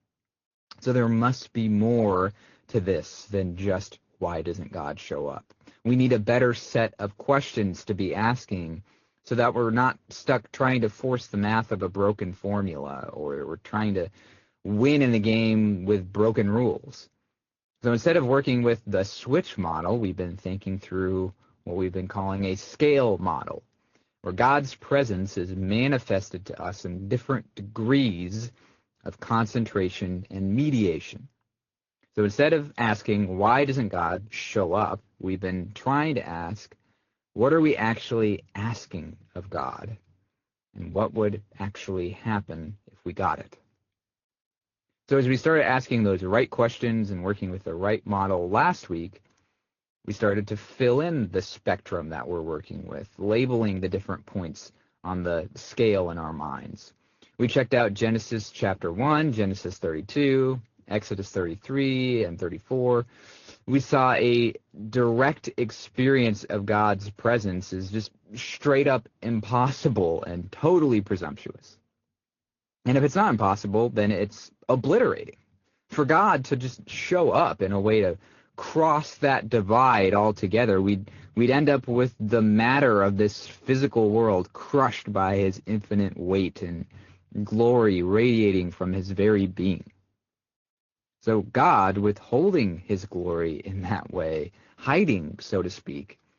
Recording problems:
high frequencies cut off; noticeable; nothing above 6.5 kHz
garbled, watery; slightly

